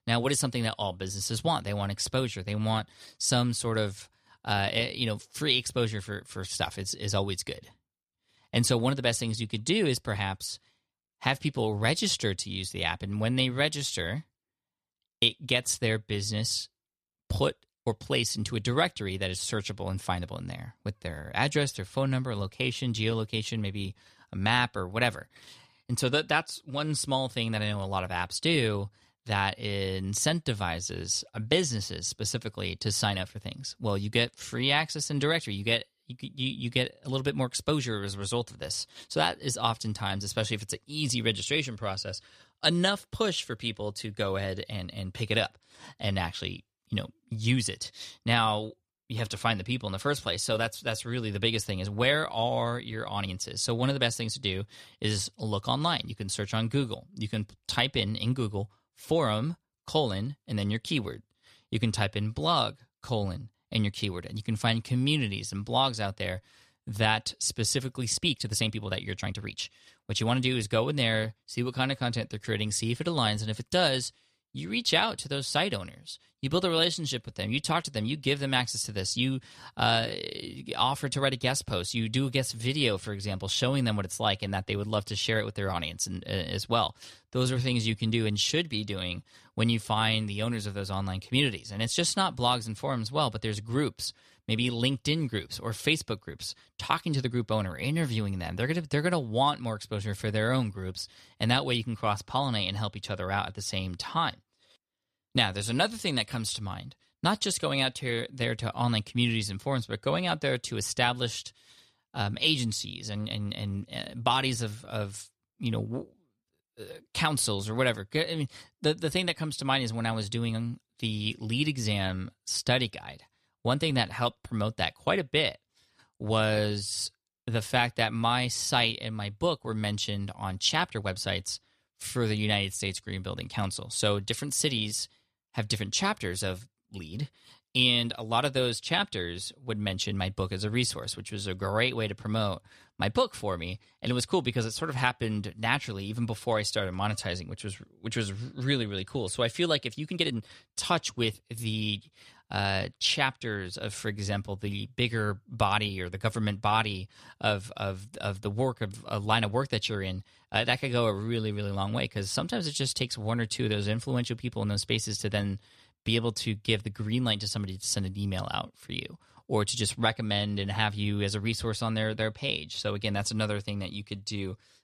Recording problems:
uneven, jittery; strongly; from 1:08 to 2:30

